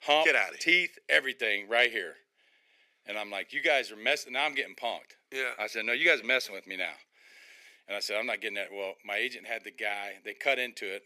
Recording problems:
thin; very; fading below 400 Hz

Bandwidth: 14.5 kHz